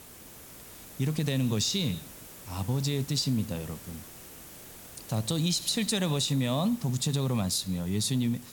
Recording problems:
hiss; noticeable; throughout; 15 dB below the speech

